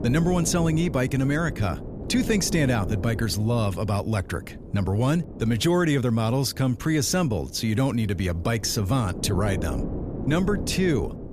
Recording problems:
wind noise on the microphone; occasional gusts; 15 dB below the speech

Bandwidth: 14.5 kHz